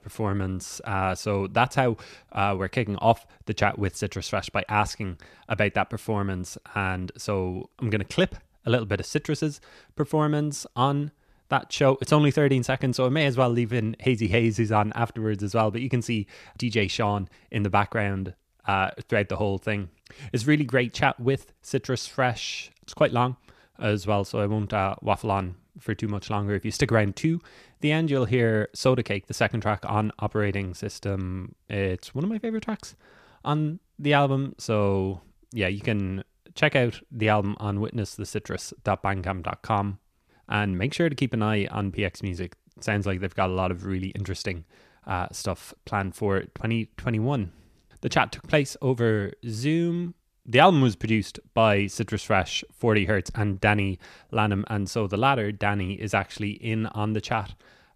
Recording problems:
none

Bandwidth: 14.5 kHz